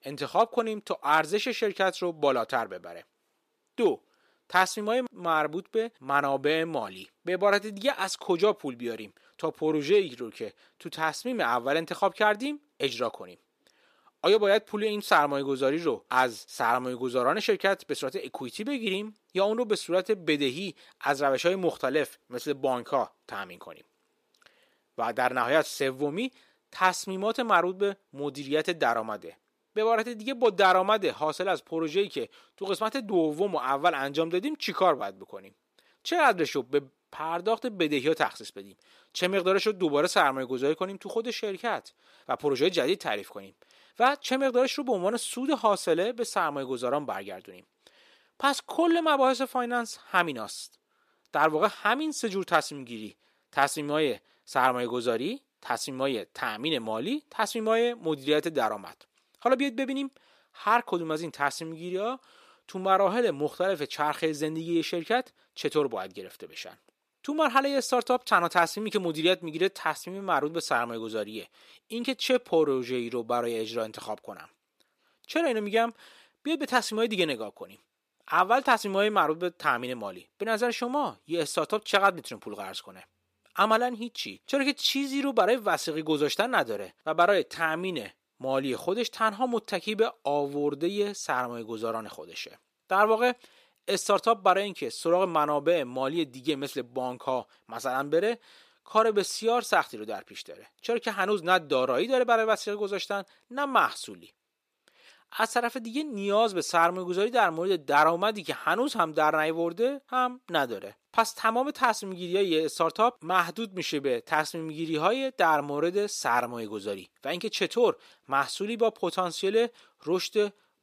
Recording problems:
thin; somewhat; fading below 350 Hz

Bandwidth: 14.5 kHz